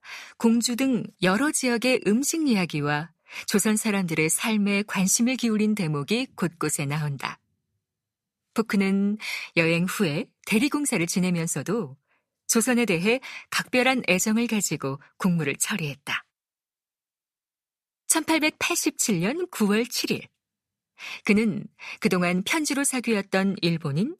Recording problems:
none

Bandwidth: 14.5 kHz